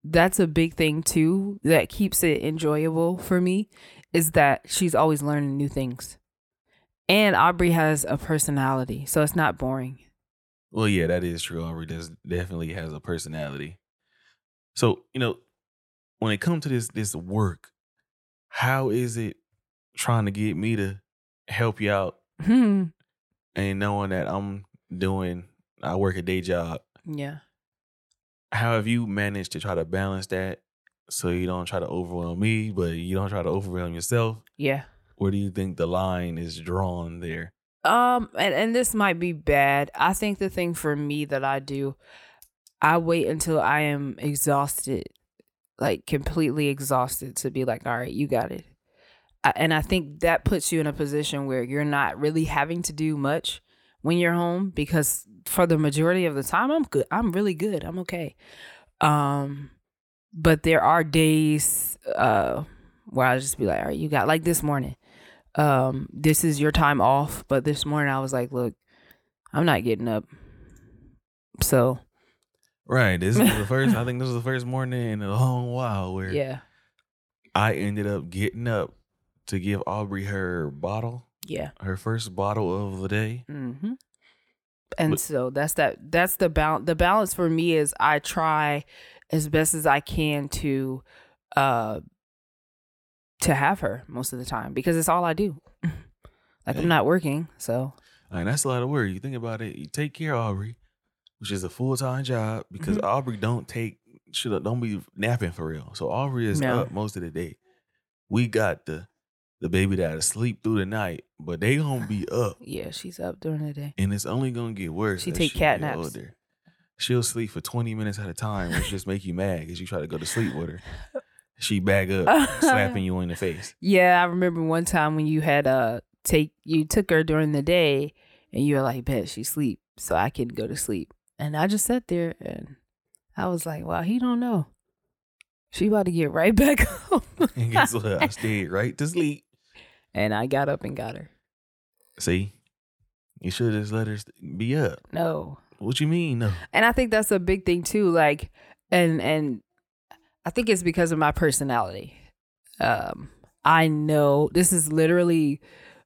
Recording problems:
none

